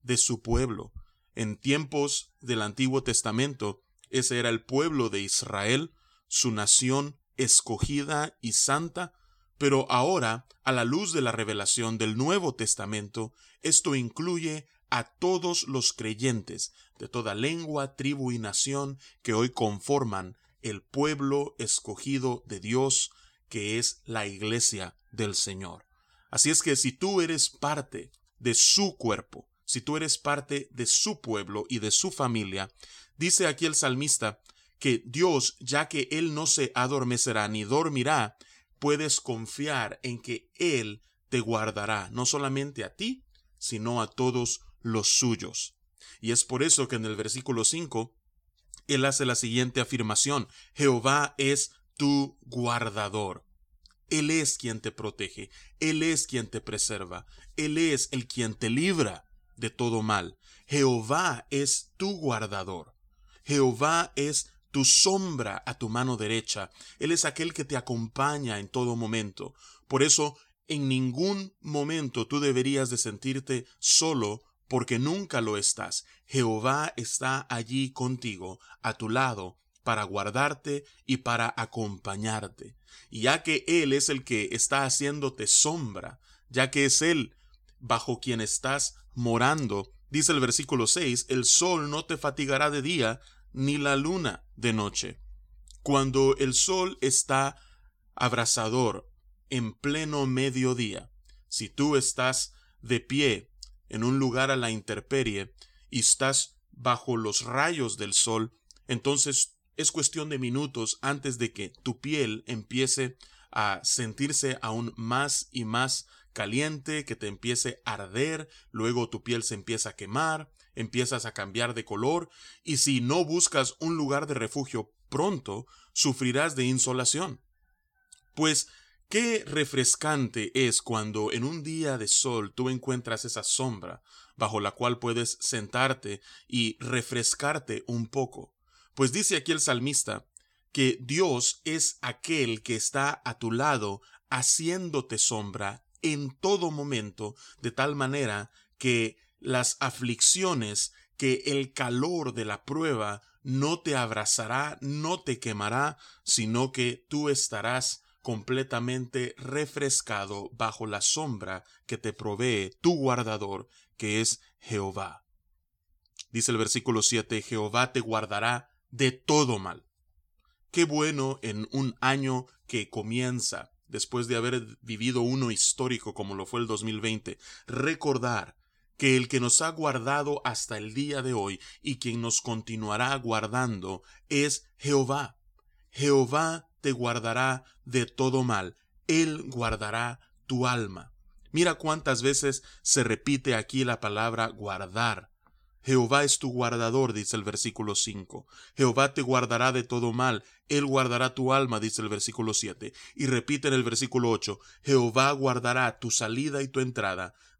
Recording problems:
none

